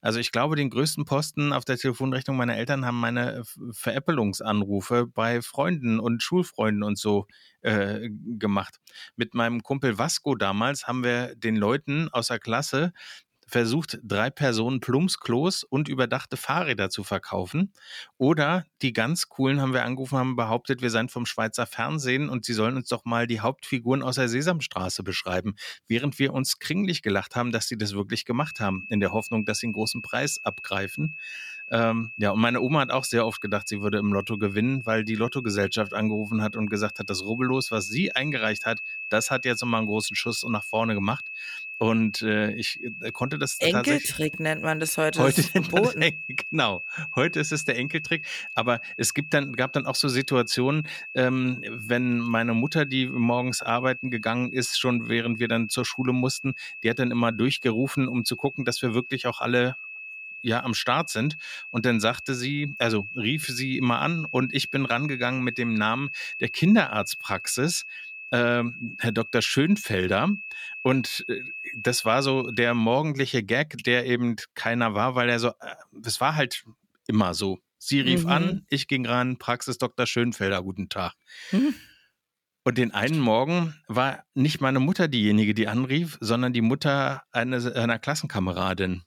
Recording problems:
high-pitched whine; loud; from 28 s to 1:13; 2.5 kHz, 9 dB below the speech

